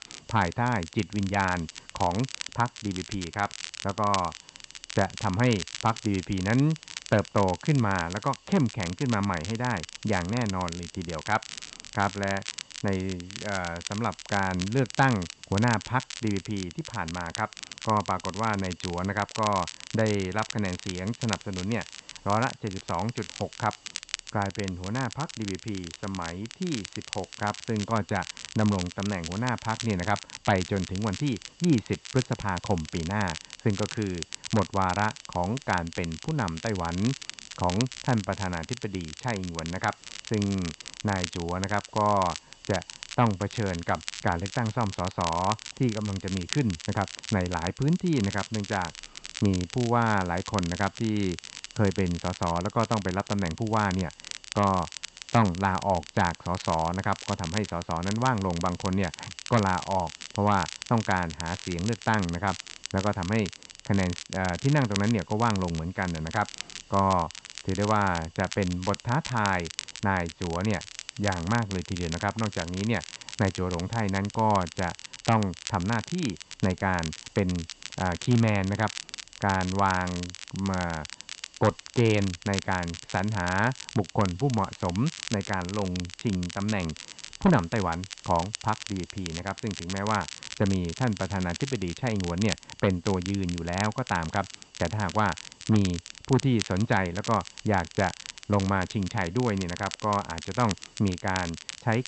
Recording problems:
muffled; slightly; fading above 4 kHz
high frequencies cut off; slight; nothing above 8 kHz
crackle, like an old record; noticeable; 10 dB below the speech
hiss; faint; throughout; 25 dB below the speech

